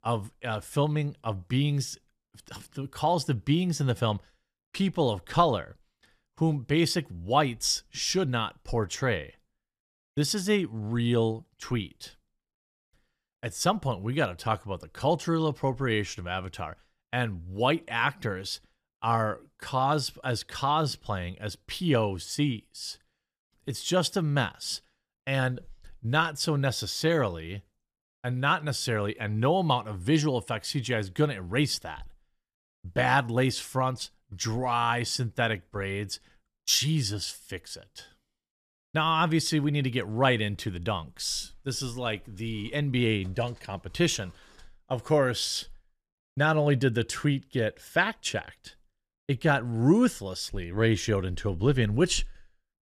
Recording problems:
none

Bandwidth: 14.5 kHz